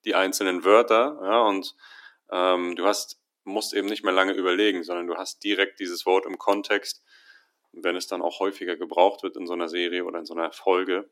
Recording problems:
thin; somewhat; fading below 300 Hz

